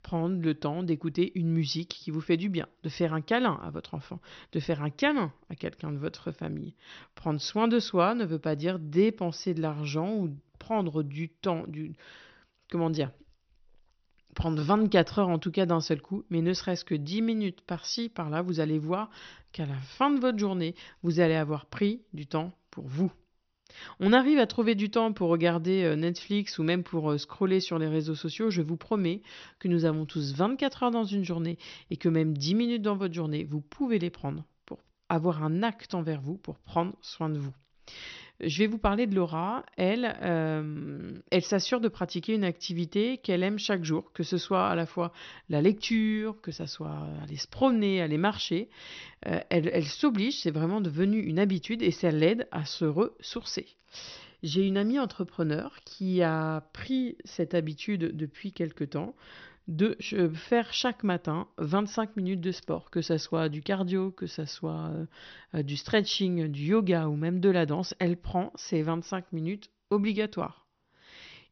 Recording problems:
high frequencies cut off; noticeable; nothing above 6 kHz

